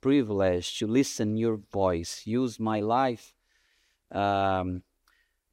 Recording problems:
none

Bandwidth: 16 kHz